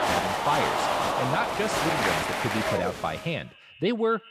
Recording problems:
echo of what is said; faint; throughout; 120 ms later, 25 dB below the speech
crowd noise; very loud; until 3 s; 3 dB above the speech

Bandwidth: 14.5 kHz